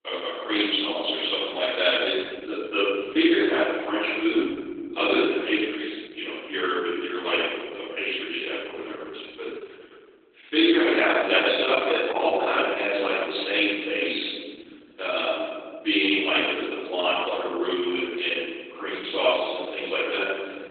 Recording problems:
off-mic speech; far
garbled, watery; badly; nothing above 3.5 kHz
room echo; noticeable; dies away in 1.8 s
thin; somewhat; fading below 300 Hz

